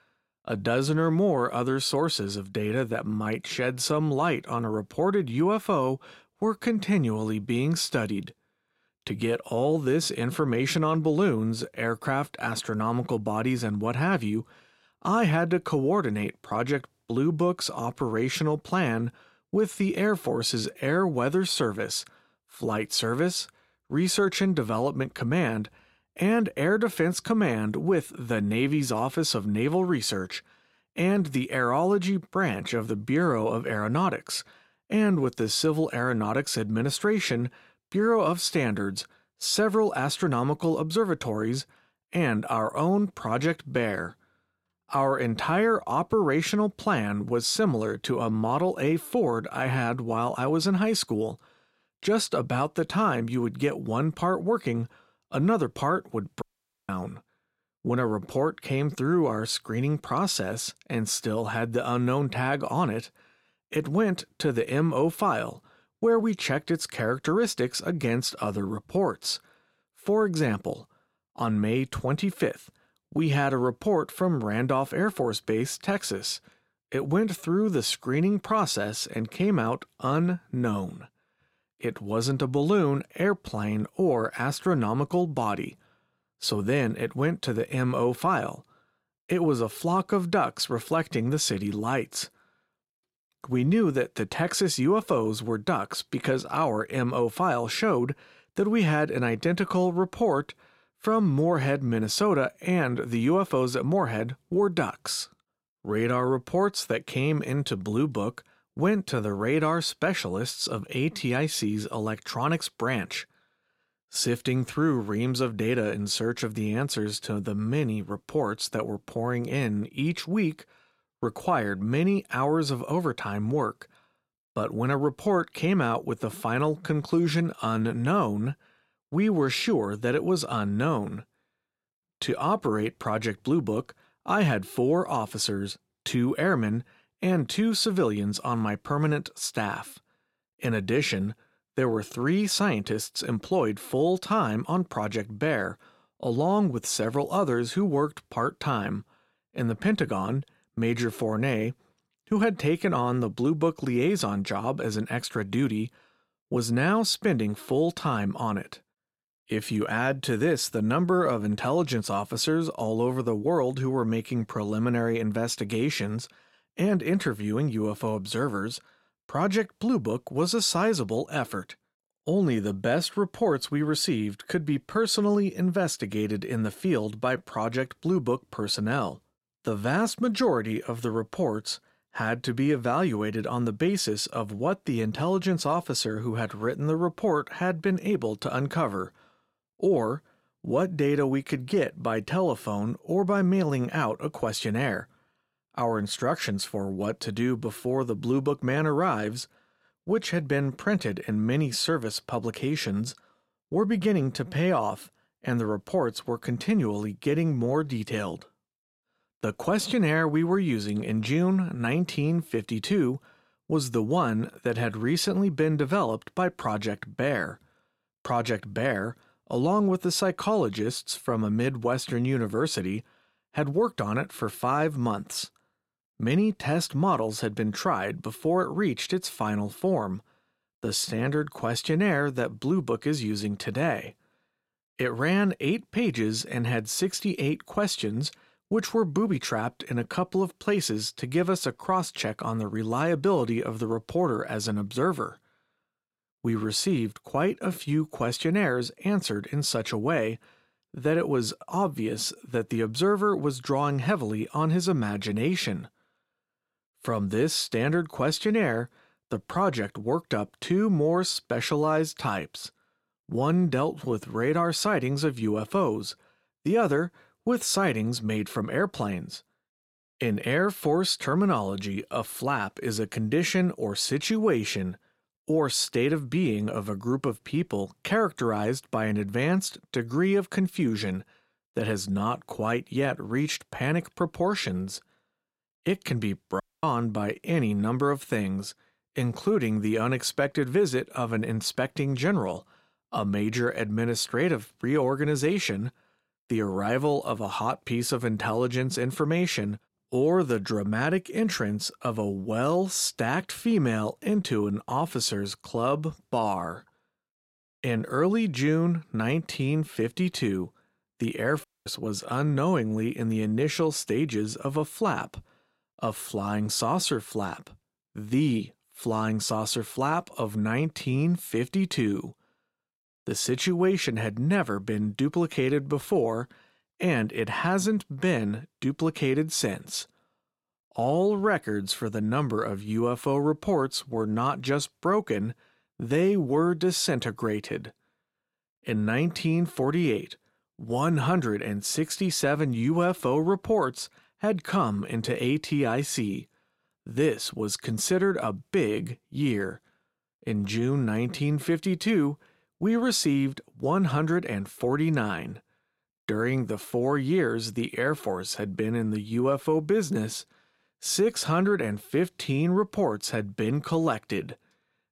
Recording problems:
audio cutting out; at 56 s, at 4:47 and at 5:12

